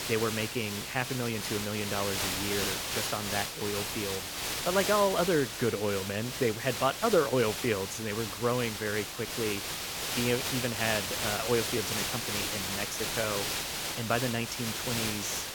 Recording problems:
hiss; loud; throughout; 1 dB below the speech

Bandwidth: 18 kHz